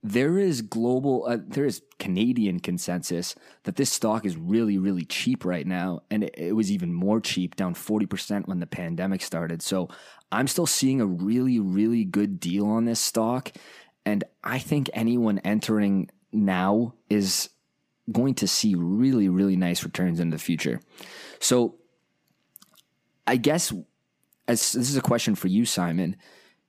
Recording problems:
none

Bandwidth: 15 kHz